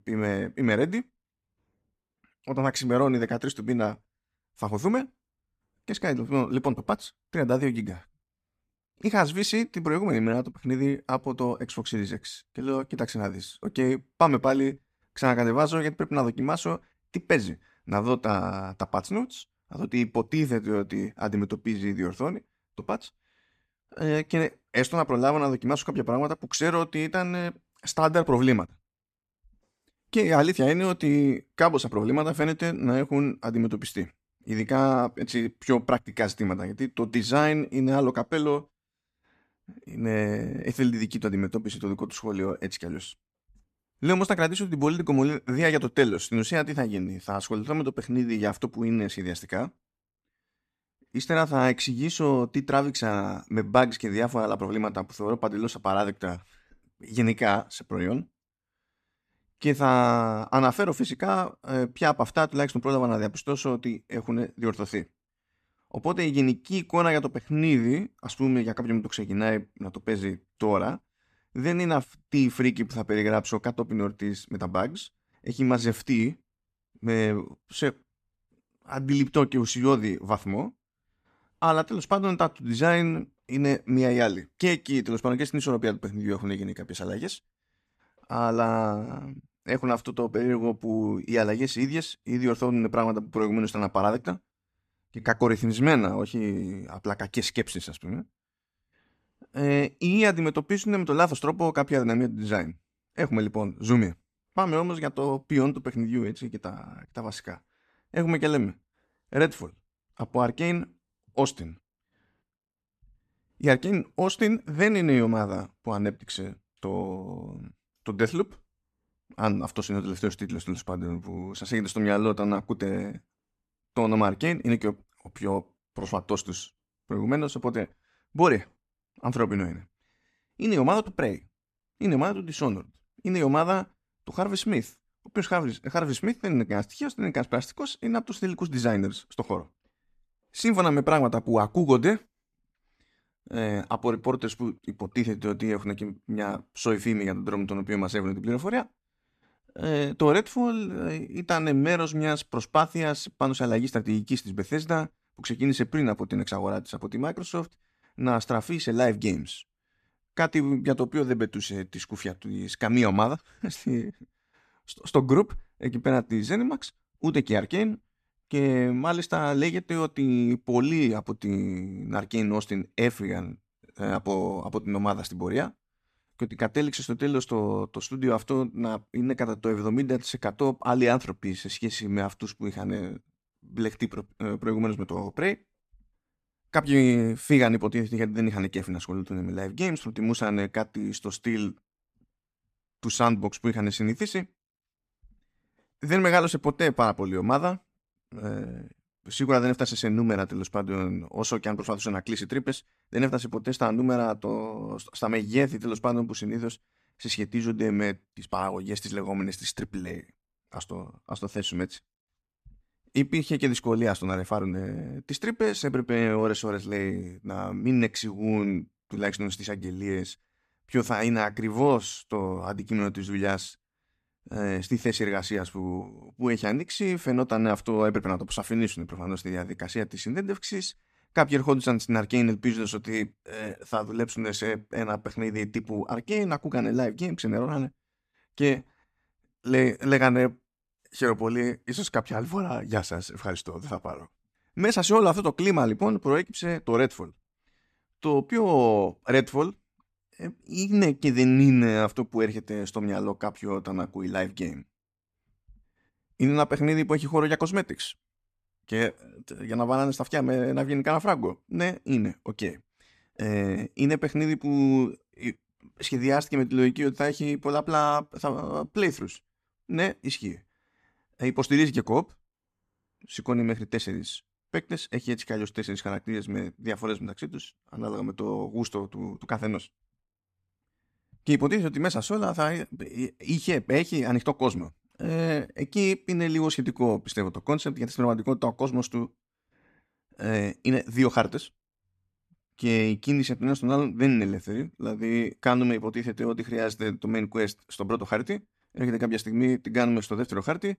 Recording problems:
none

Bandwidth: 14.5 kHz